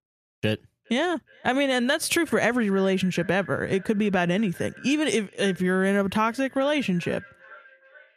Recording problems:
echo of what is said; faint; throughout; 420 ms later, 20 dB below the speech

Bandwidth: 14.5 kHz